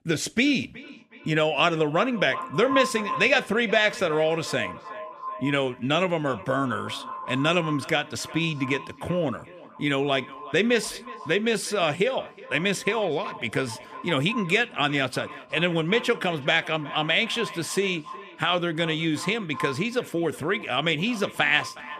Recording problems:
echo of what is said; noticeable; throughout; 370 ms later, 15 dB below the speech

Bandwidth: 15 kHz